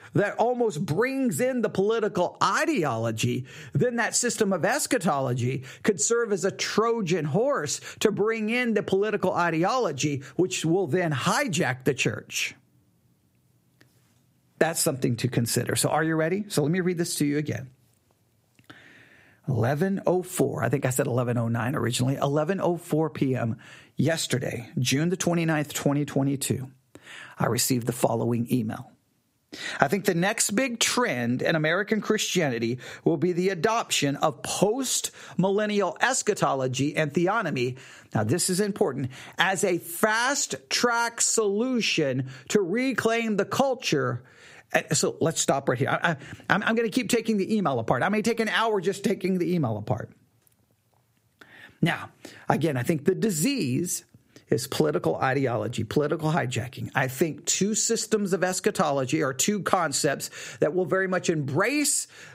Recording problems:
squashed, flat; somewhat

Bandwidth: 15.5 kHz